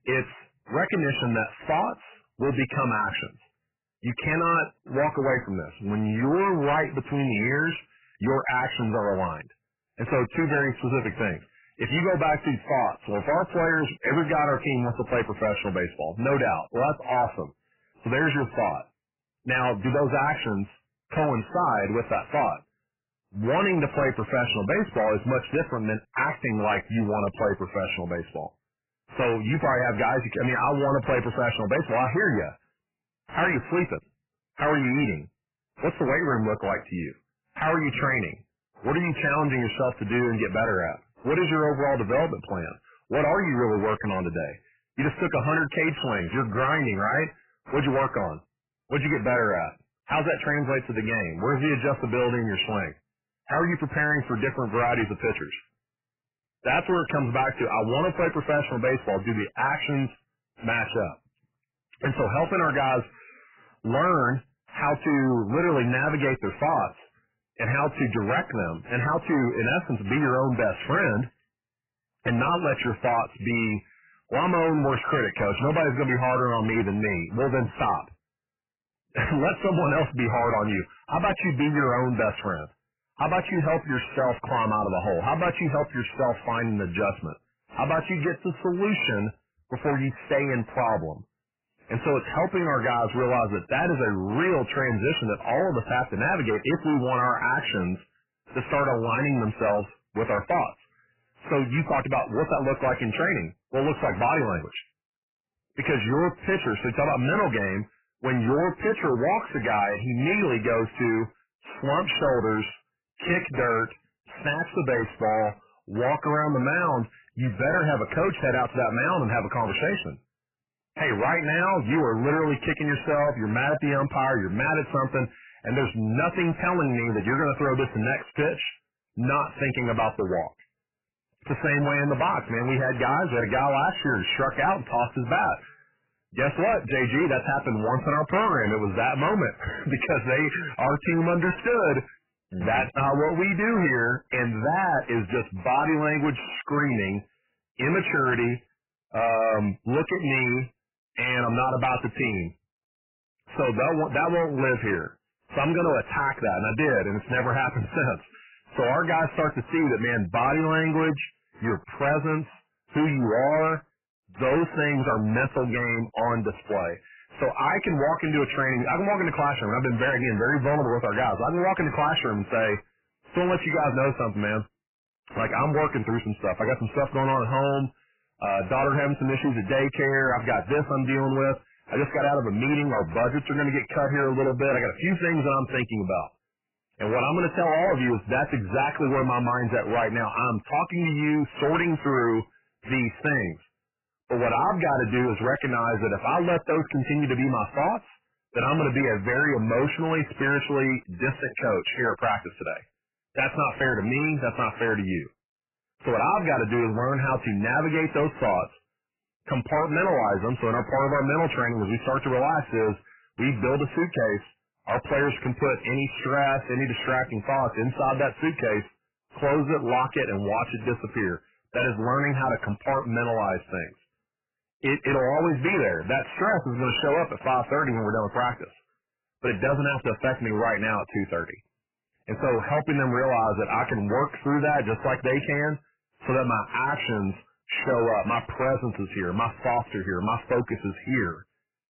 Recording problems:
distortion; heavy; 6 dB below the speech
garbled, watery; badly; nothing above 3 kHz

